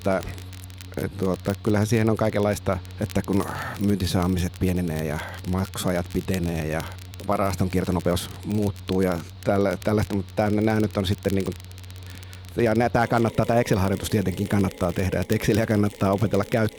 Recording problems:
machinery noise; noticeable; throughout; 15 dB below the speech
crackle, like an old record; faint; 20 dB below the speech
uneven, jittery; strongly; from 1 to 16 s

